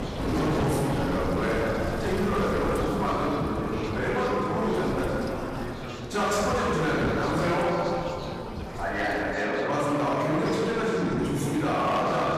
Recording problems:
room echo; strong; dies away in 2.2 s
off-mic speech; far
distortion; slight; 17% of the sound clipped
rain or running water; loud; throughout; 7 dB below the speech
chatter from many people; noticeable; throughout; 10 dB below the speech
wind noise on the microphone; occasional gusts; until 9.5 s; 15 dB below the speech

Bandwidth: 14.5 kHz